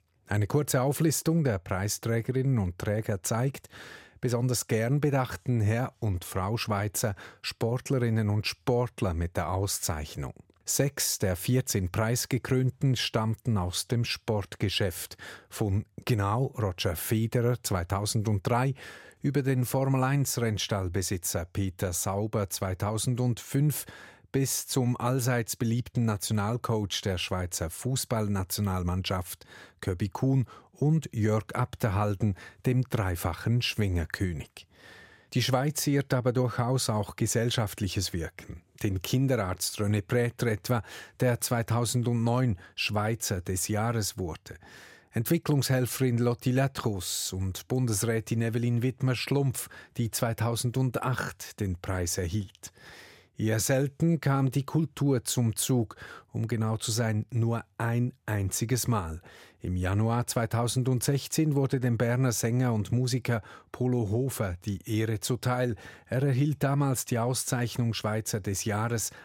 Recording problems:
none

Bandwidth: 16.5 kHz